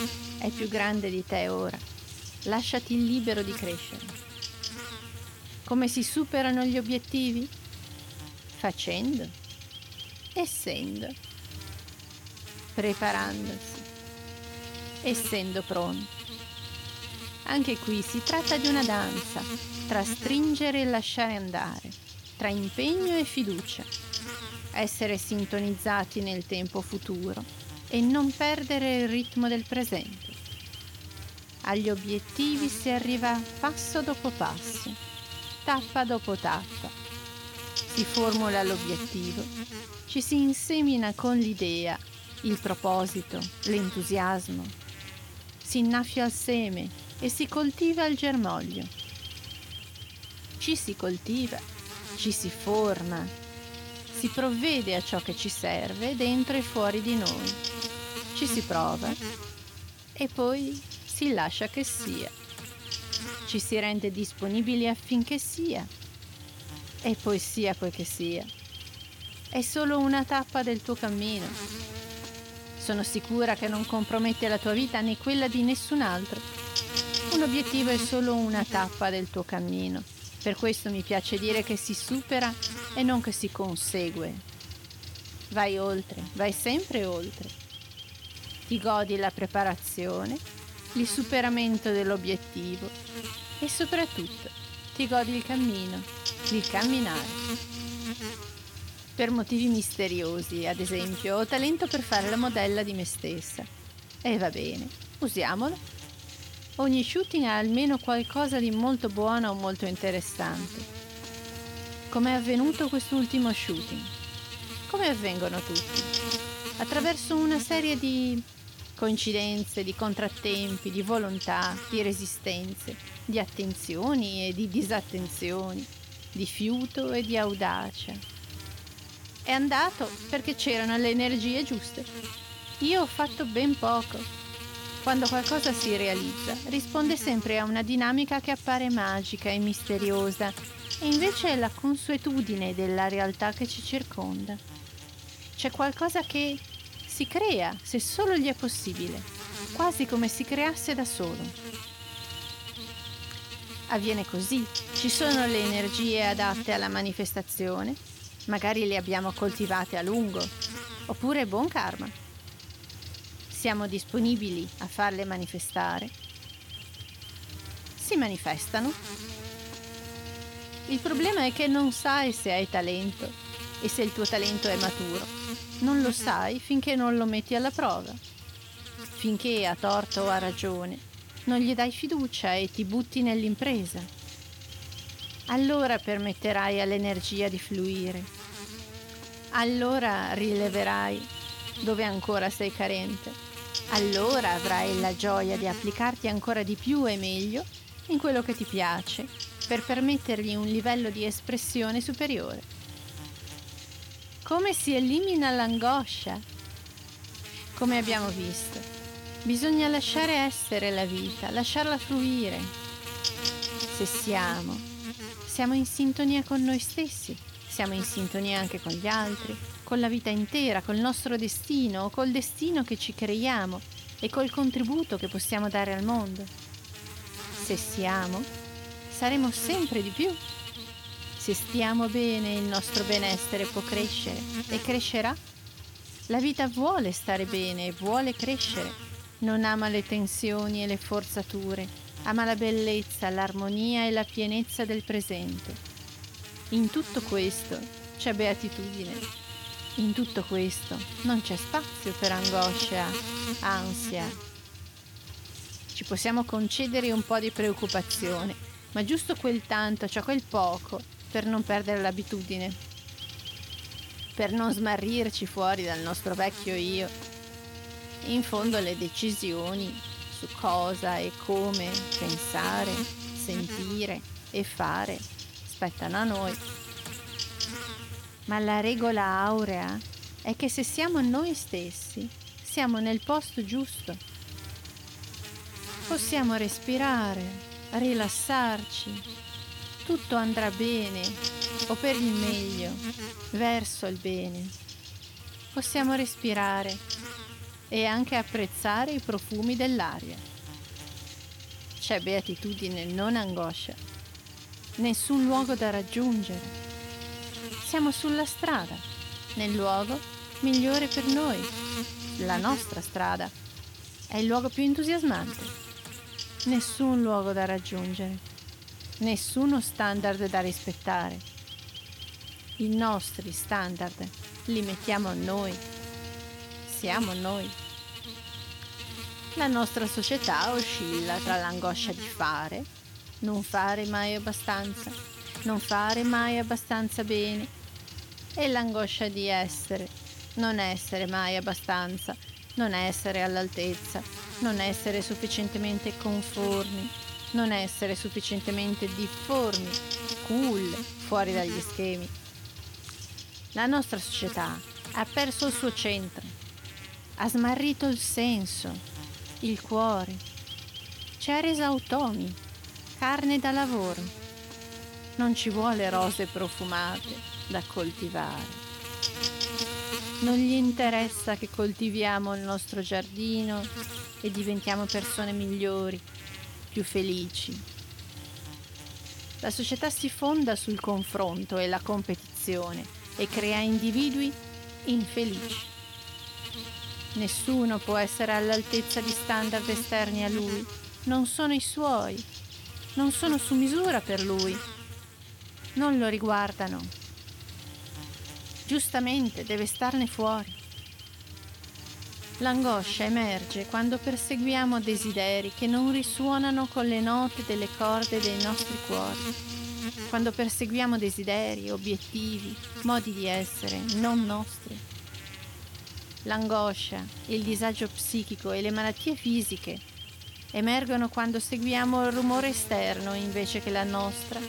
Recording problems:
electrical hum; loud; throughout; 50 Hz, 9 dB below the speech

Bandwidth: 17.5 kHz